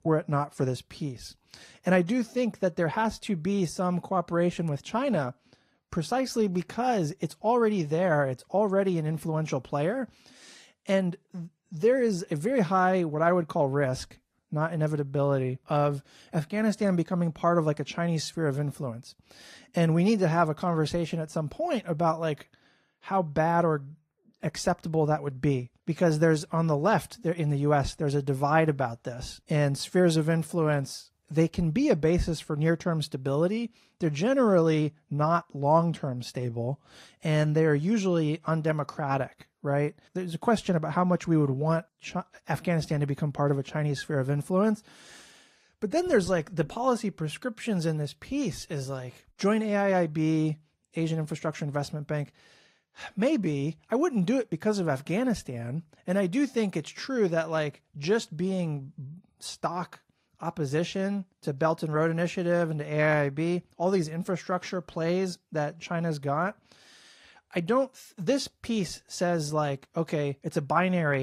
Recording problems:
garbled, watery; slightly
abrupt cut into speech; at the end

